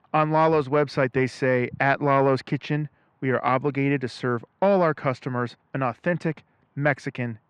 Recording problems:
muffled; slightly; fading above 2.5 kHz

